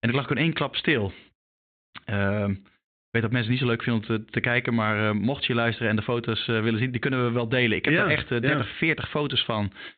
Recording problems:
high frequencies cut off; severe; nothing above 4 kHz

